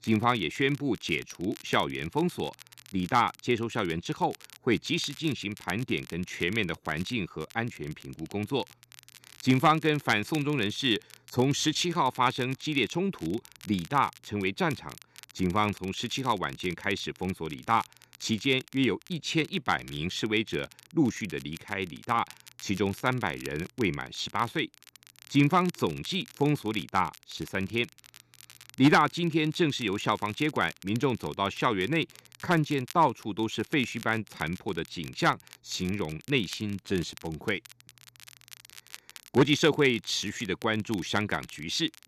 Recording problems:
crackle, like an old record; faint; 20 dB below the speech

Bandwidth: 13.5 kHz